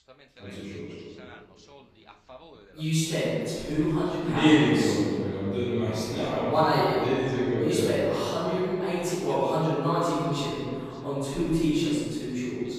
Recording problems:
room echo; strong; dies away in 2 s
off-mic speech; far
voice in the background; faint; throughout; 25 dB below the speech

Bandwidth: 14.5 kHz